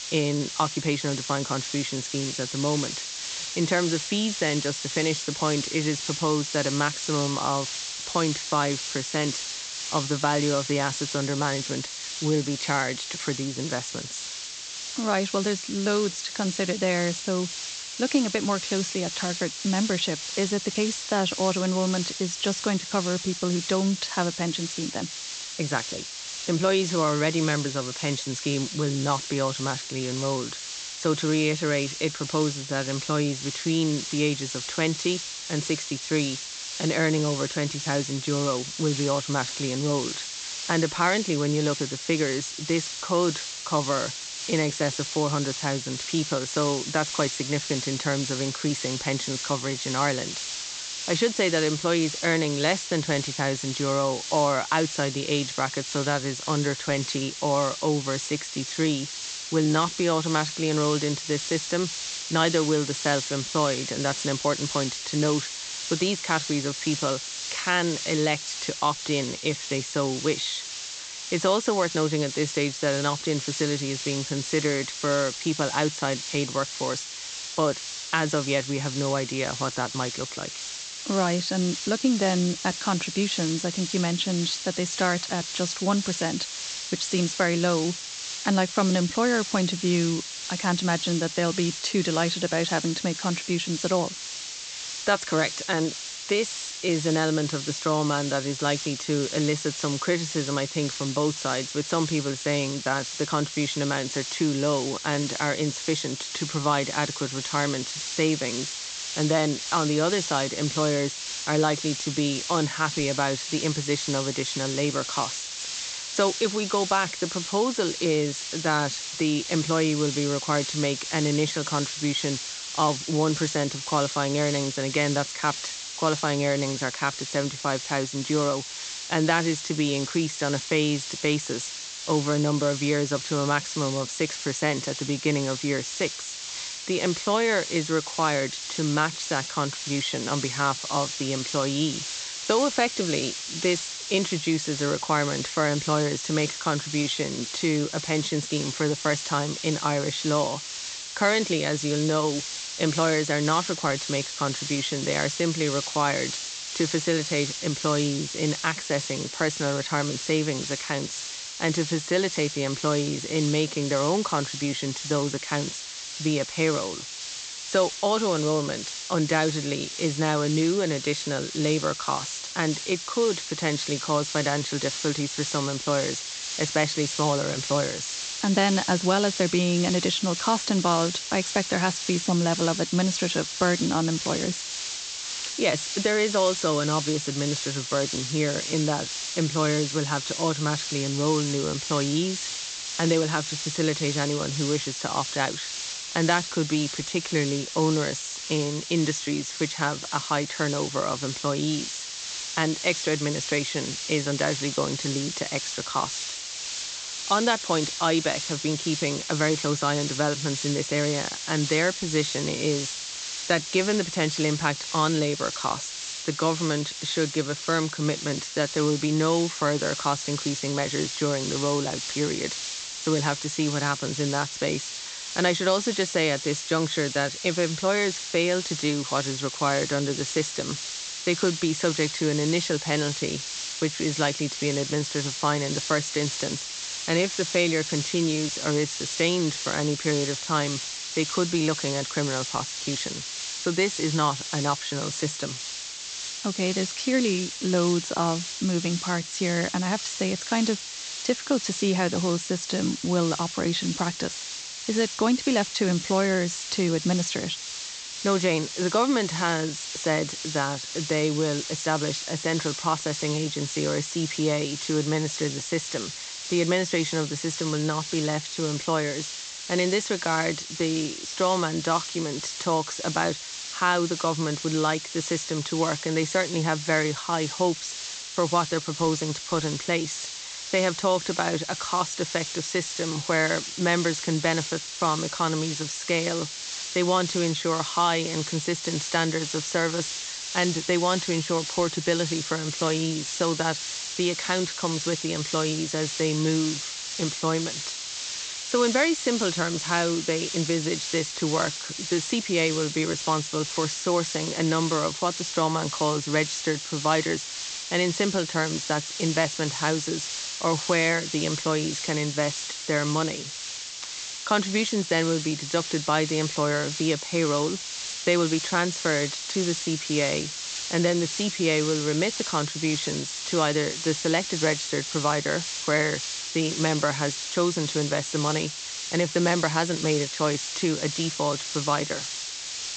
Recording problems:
high frequencies cut off; noticeable; nothing above 8 kHz
hiss; loud; throughout; 5 dB below the speech

